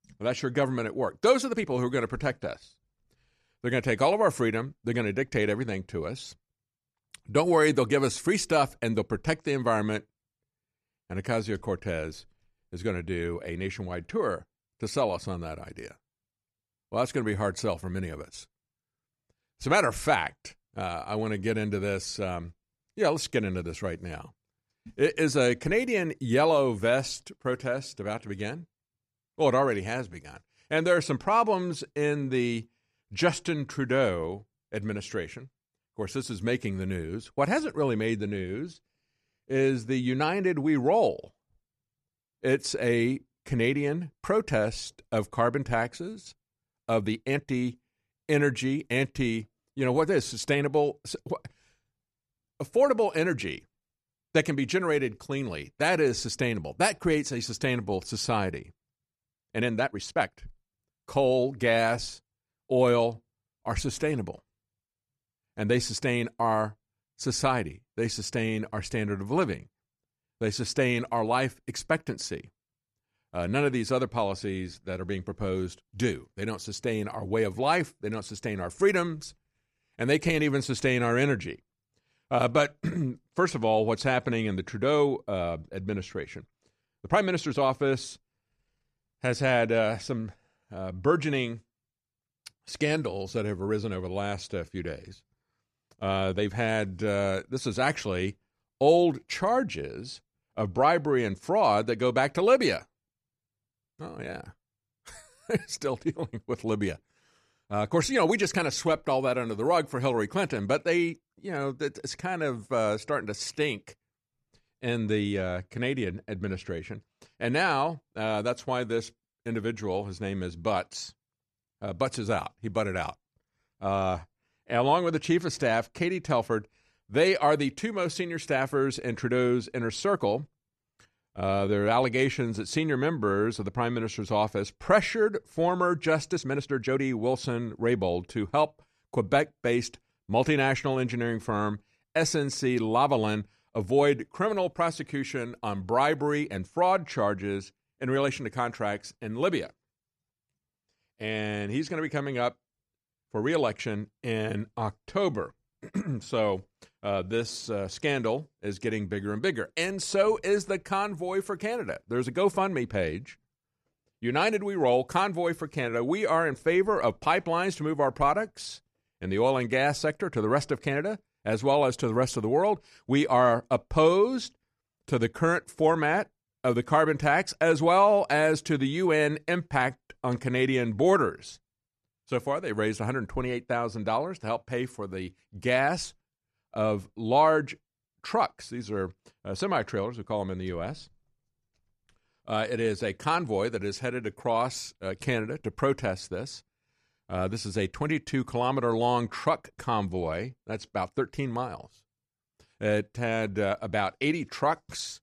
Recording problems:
uneven, jittery; strongly; from 1.5 s to 2:38

